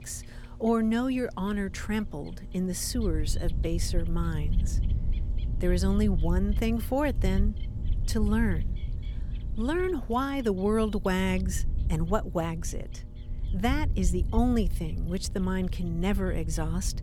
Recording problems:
wind noise on the microphone; occasional gusts; 20 dB below the speech
electrical hum; faint; throughout; 60 Hz, 25 dB below the speech
animal sounds; faint; throughout; 30 dB below the speech

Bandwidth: 18.5 kHz